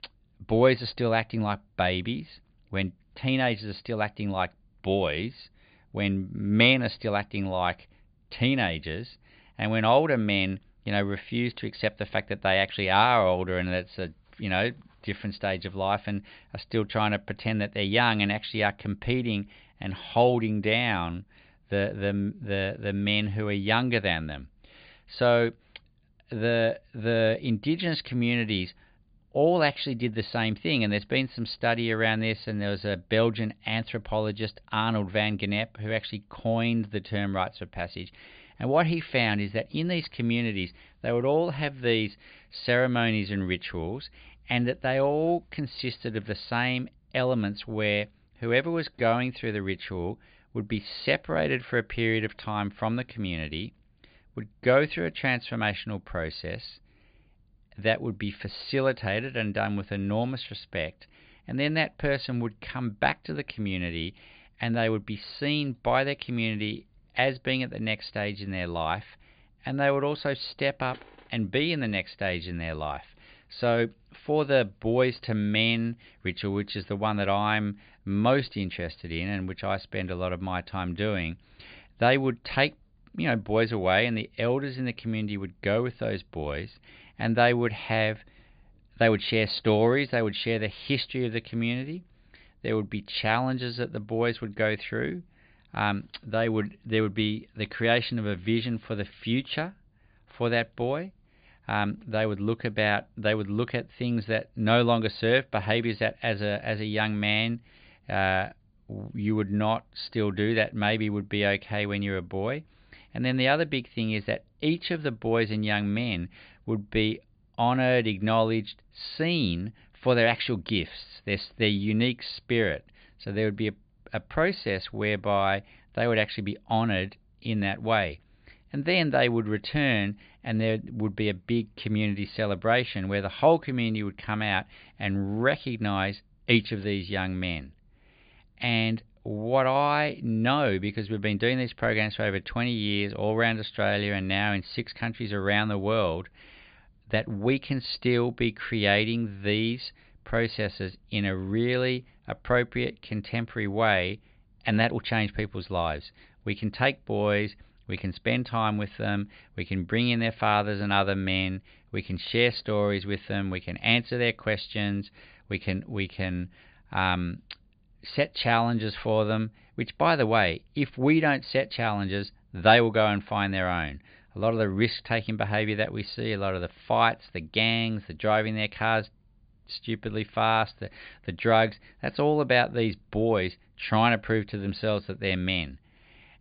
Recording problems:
high frequencies cut off; severe; nothing above 5 kHz

